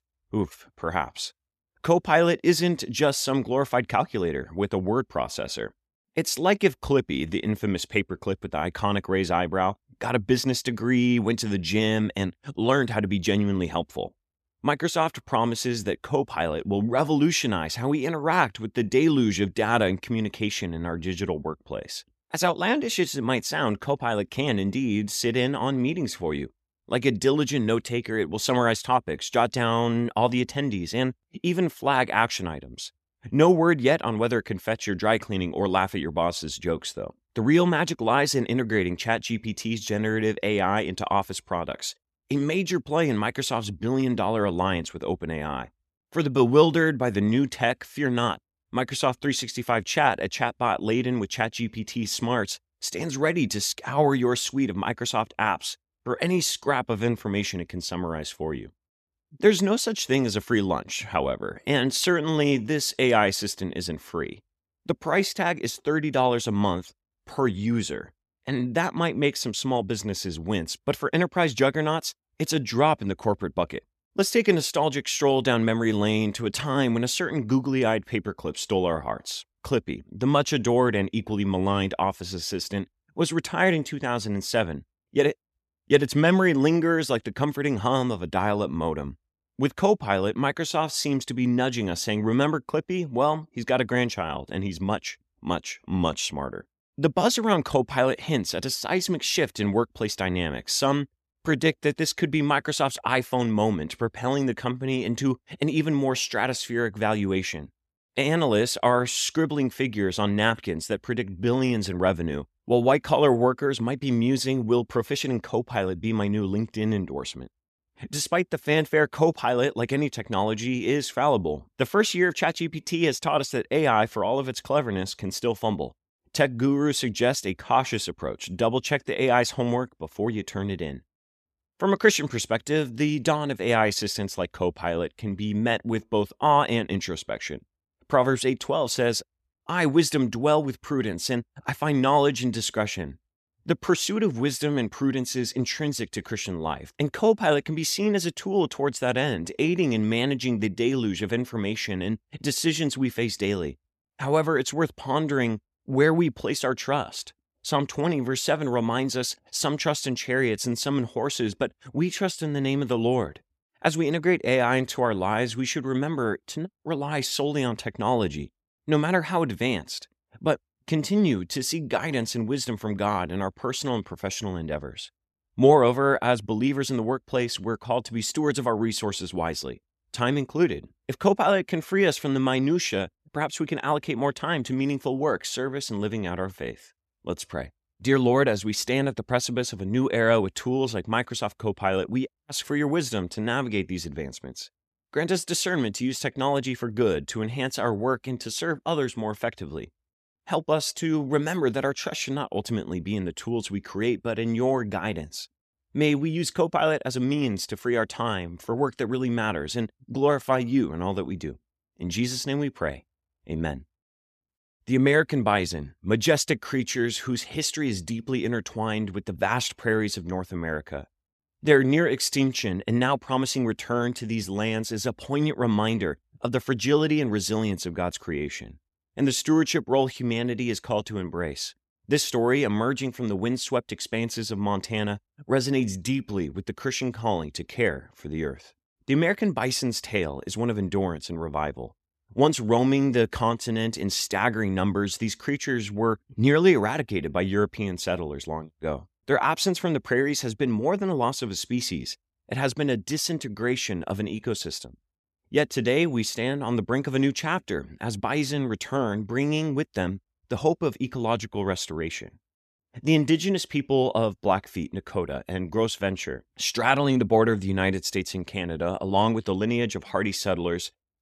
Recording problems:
none

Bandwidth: 14 kHz